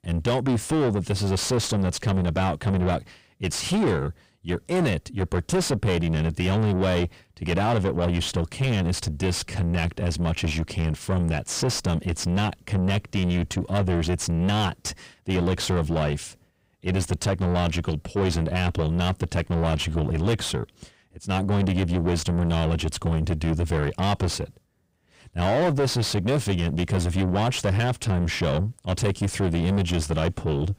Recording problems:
distortion; heavy; 7 dB below the speech

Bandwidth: 15.5 kHz